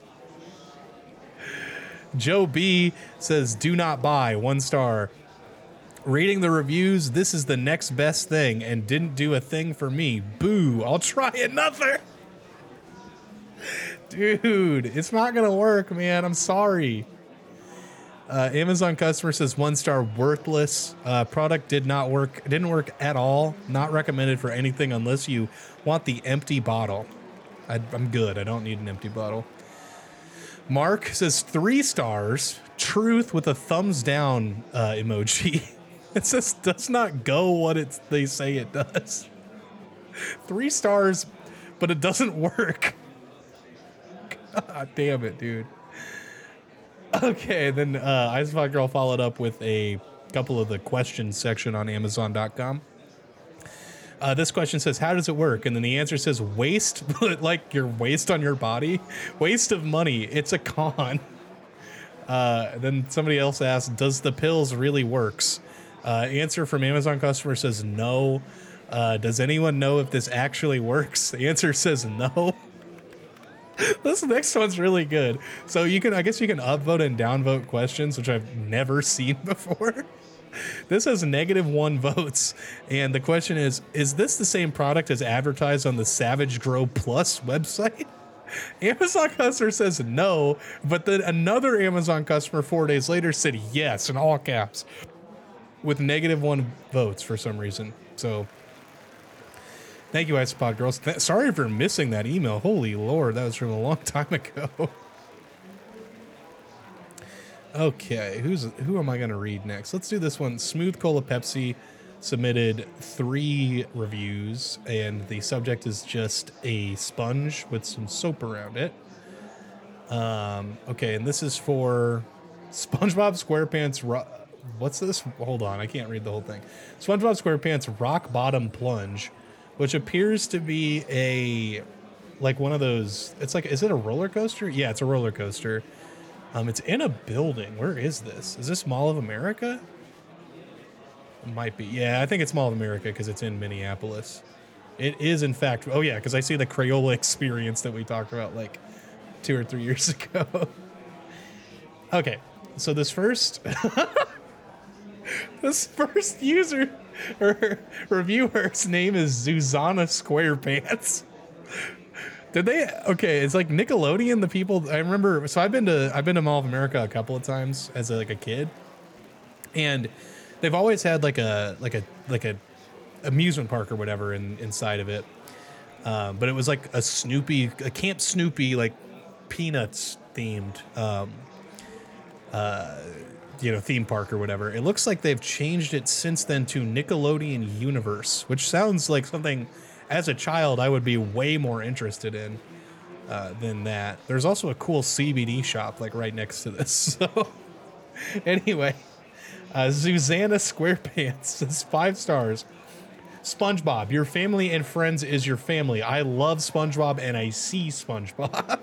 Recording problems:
murmuring crowd; faint; throughout; 20 dB below the speech

